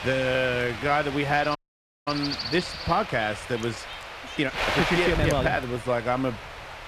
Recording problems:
wind noise on the microphone; heavy; 5 dB below the speech
train or aircraft noise; faint; throughout; 20 dB below the speech
uneven, jittery; strongly; from 0.5 to 6 s
audio cutting out; at 1.5 s for 0.5 s

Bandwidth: 14.5 kHz